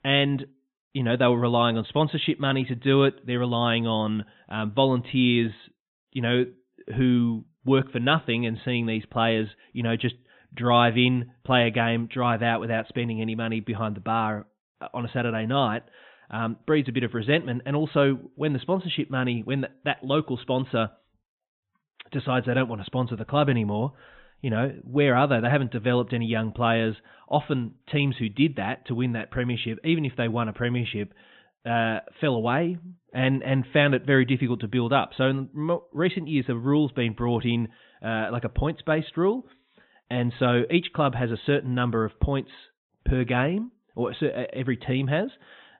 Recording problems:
high frequencies cut off; severe; nothing above 3.5 kHz

